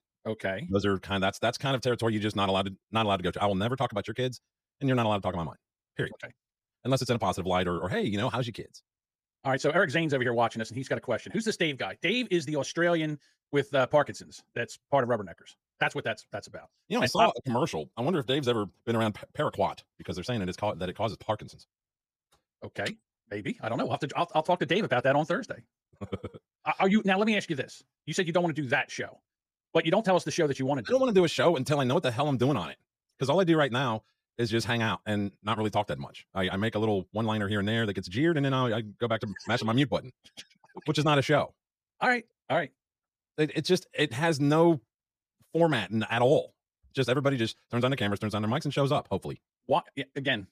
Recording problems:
wrong speed, natural pitch; too fast; 1.5 times normal speed

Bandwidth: 14.5 kHz